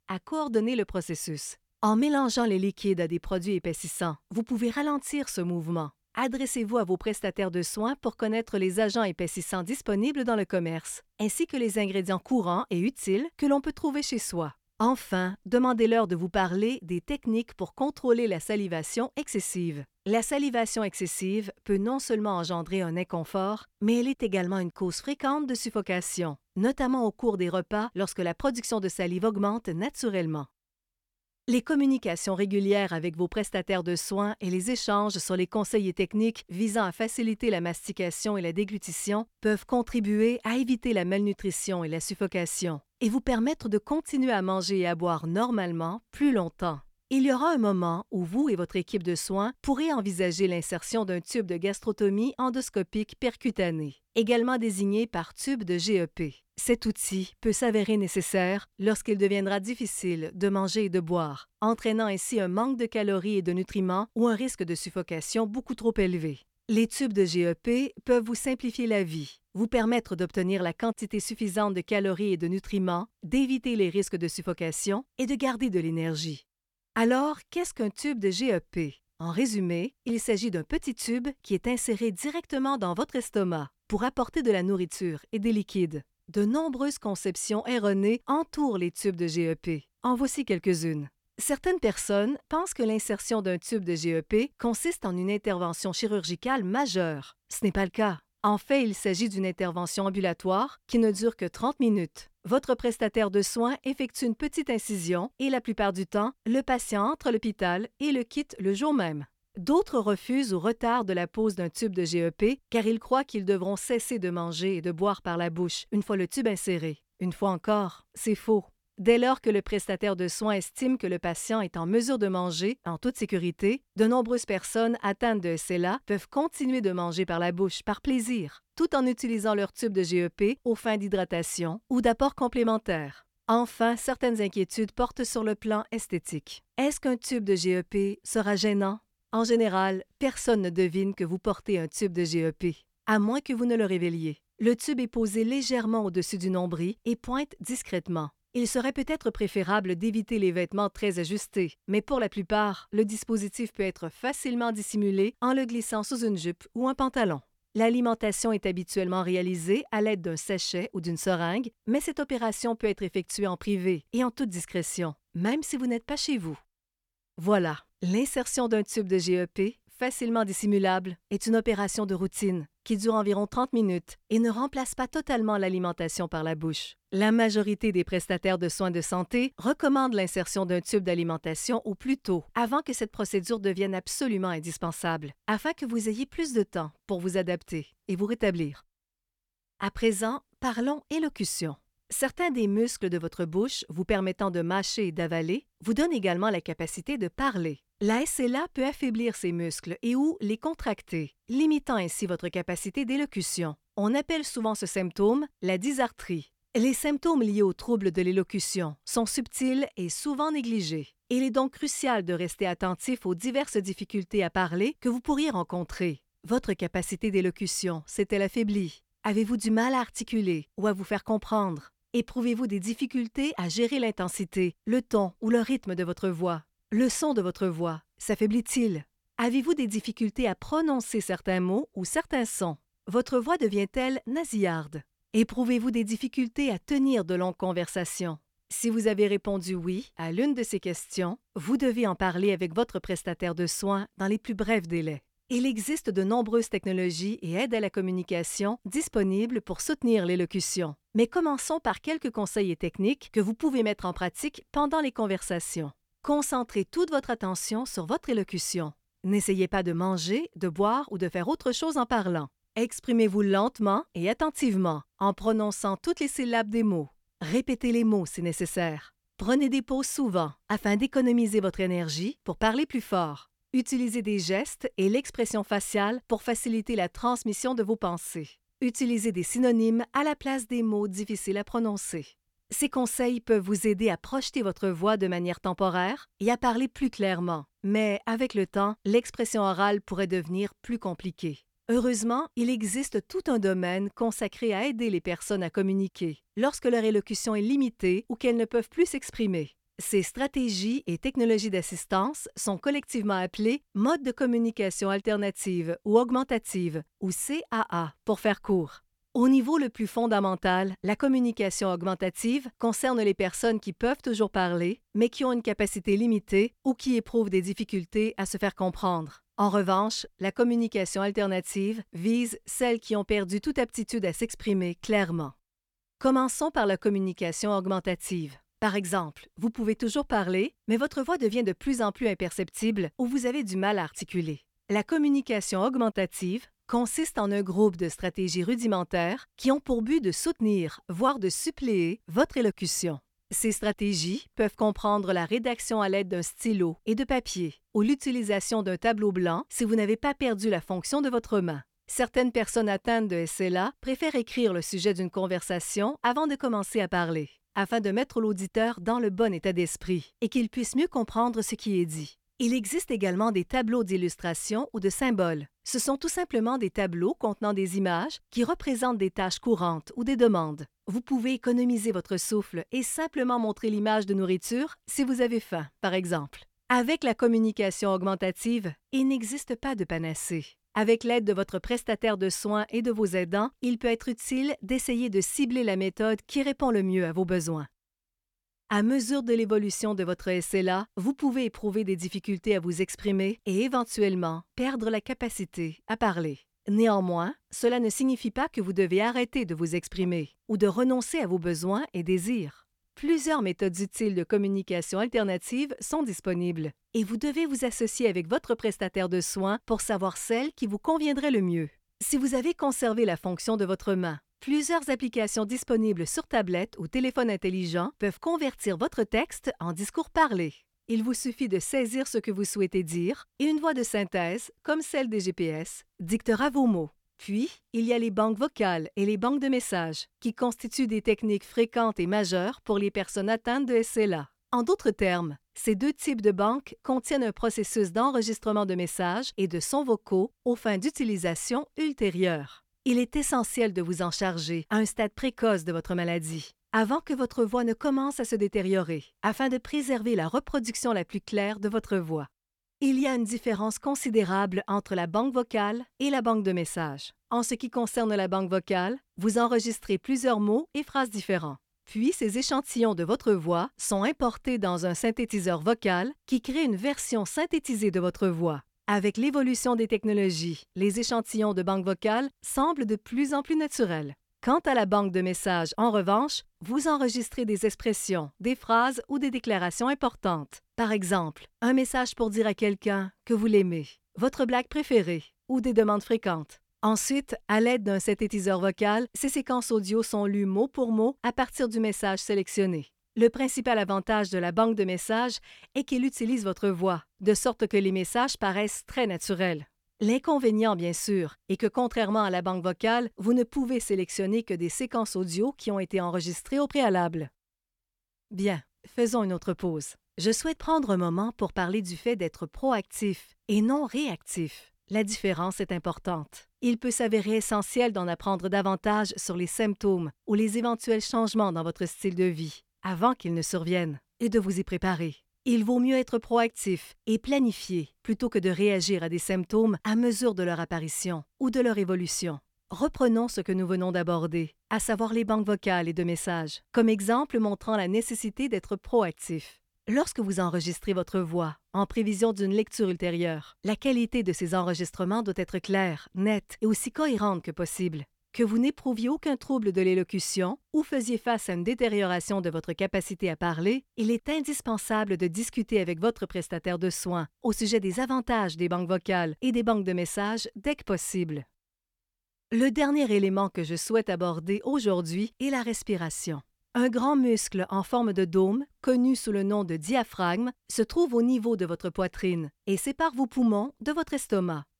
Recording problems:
none

